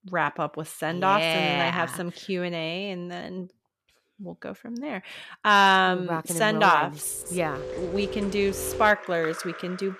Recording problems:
rain or running water; noticeable; from 7.5 s on; 10 dB below the speech

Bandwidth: 14 kHz